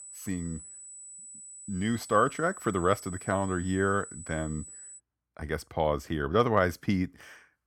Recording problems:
high-pitched whine; noticeable; until 5 s; 8 kHz, 15 dB below the speech

